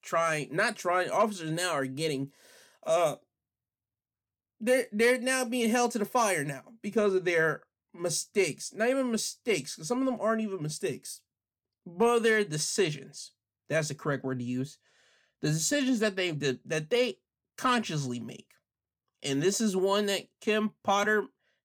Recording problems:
none

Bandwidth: 18 kHz